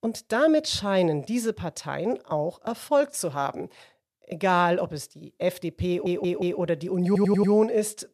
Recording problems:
audio stuttering; at 6 s and at 7 s

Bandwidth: 14.5 kHz